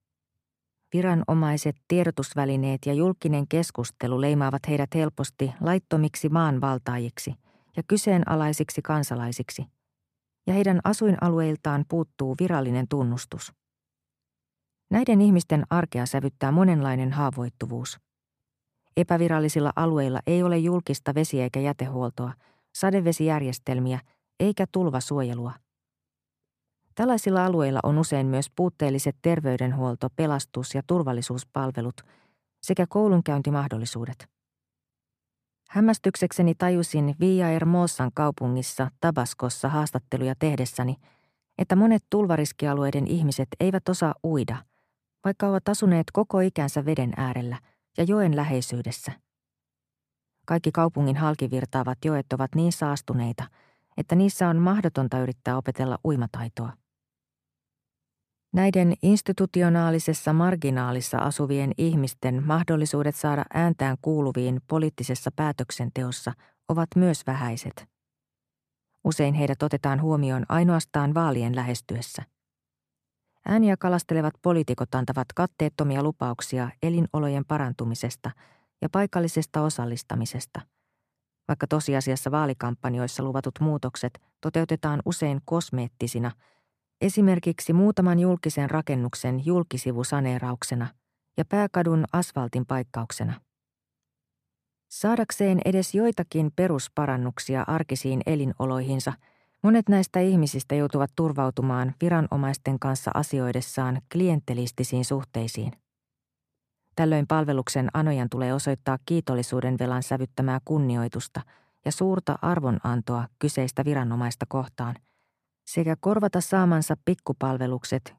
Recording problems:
none

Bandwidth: 14.5 kHz